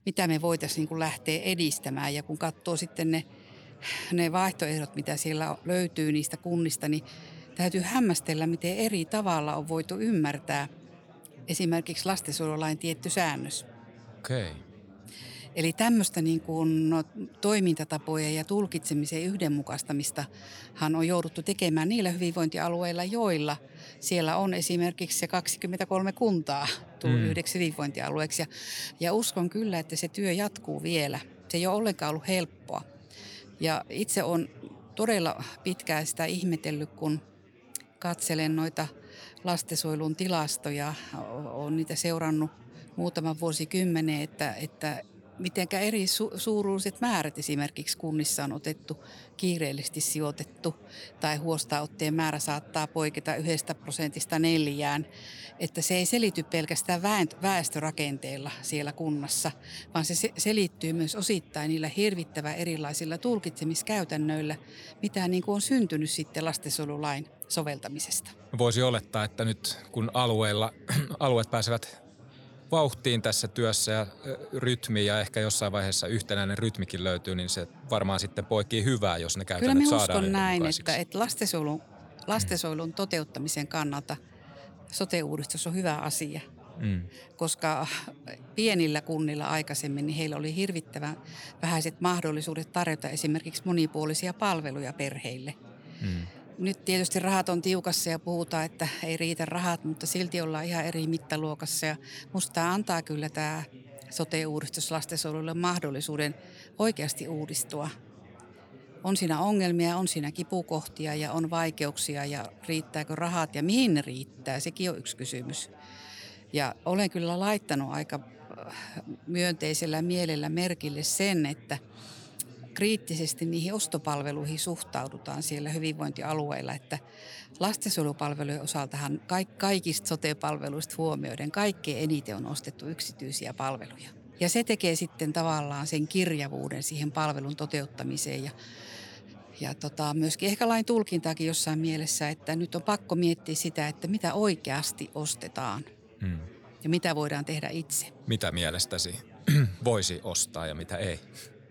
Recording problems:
chatter from many people; faint; throughout; 20 dB below the speech

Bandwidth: 19 kHz